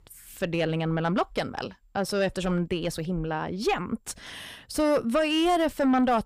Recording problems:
distortion; slight; 9 dB below the speech

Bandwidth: 15 kHz